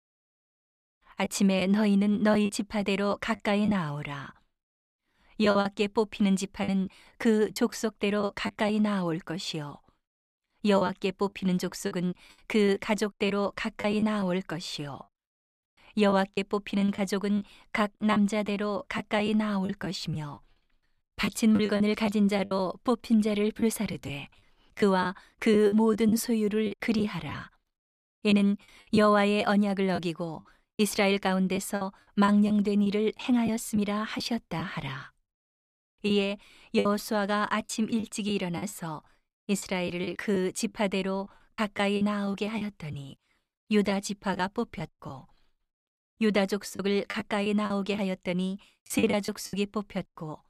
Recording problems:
choppy; very; 7% of the speech affected

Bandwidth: 14.5 kHz